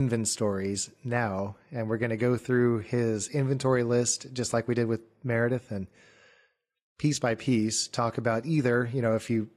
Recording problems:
garbled, watery; slightly; nothing above 15 kHz
abrupt cut into speech; at the start

